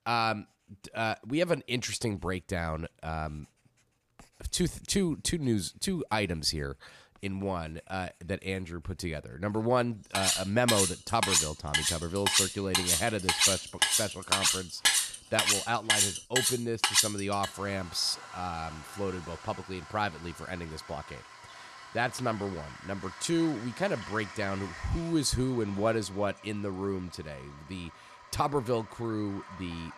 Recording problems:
household noises; very loud; throughout; 5 dB above the speech

